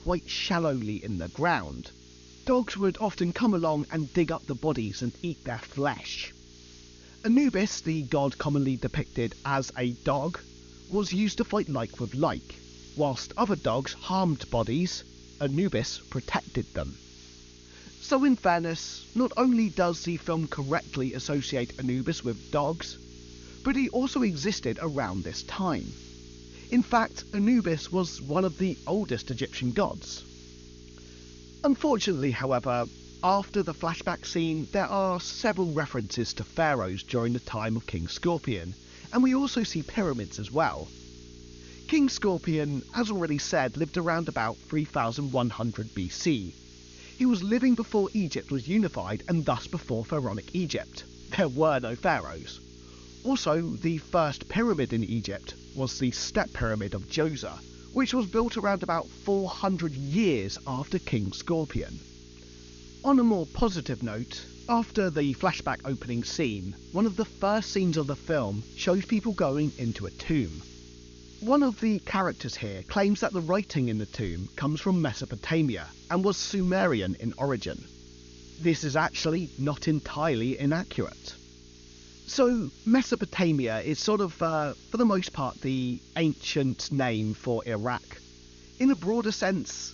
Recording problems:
high frequencies cut off; noticeable; nothing above 7 kHz
electrical hum; faint; throughout; 60 Hz, 25 dB below the speech
hiss; faint; throughout; 25 dB below the speech

